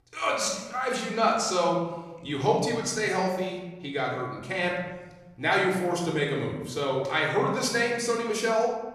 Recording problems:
off-mic speech; far
room echo; noticeable; dies away in 1.1 s

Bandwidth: 14.5 kHz